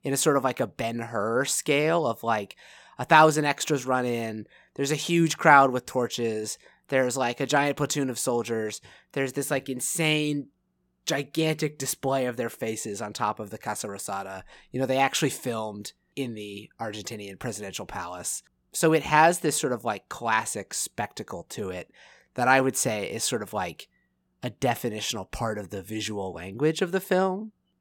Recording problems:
none

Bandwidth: 17 kHz